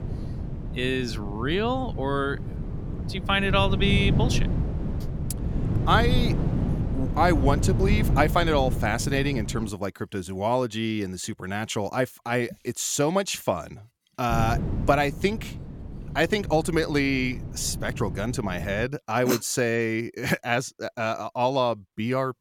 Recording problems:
wind noise on the microphone; occasional gusts; until 9.5 s and from 14 to 19 s; 10 dB below the speech

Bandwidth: 17 kHz